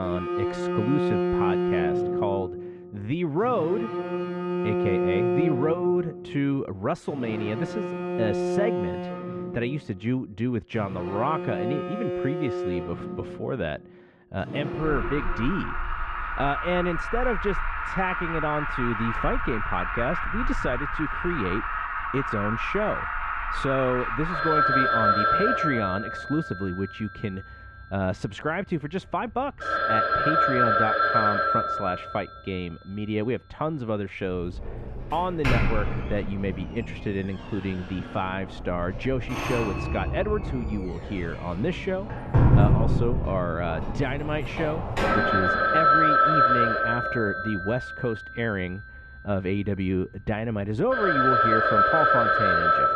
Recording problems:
muffled; very; fading above 2.5 kHz
alarms or sirens; very loud; throughout; 4 dB above the speech
abrupt cut into speech; at the start

